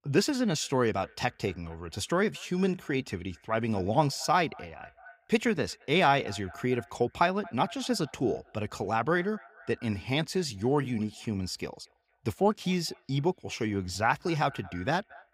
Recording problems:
echo of what is said; faint; throughout; 230 ms later, 25 dB below the speech

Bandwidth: 15.5 kHz